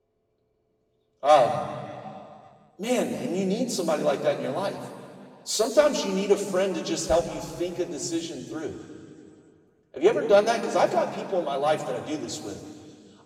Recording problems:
off-mic speech; far
room echo; noticeable; dies away in 2 s

